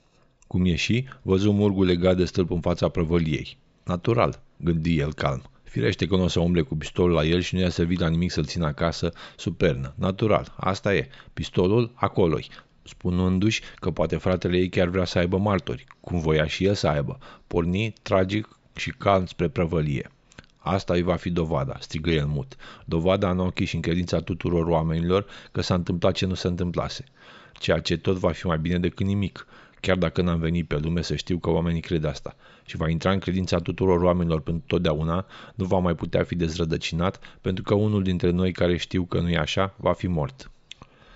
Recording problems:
high frequencies cut off; noticeable; nothing above 8 kHz

